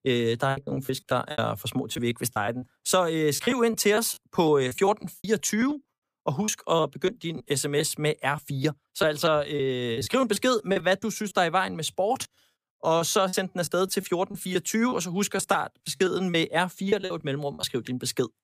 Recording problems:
choppy; very; 11% of the speech affected

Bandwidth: 15 kHz